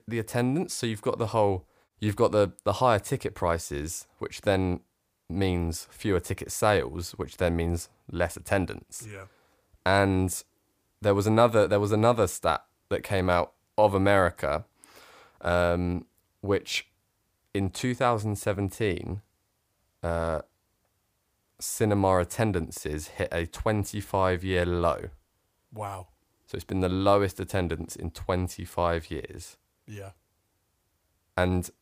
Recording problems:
none

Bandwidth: 15 kHz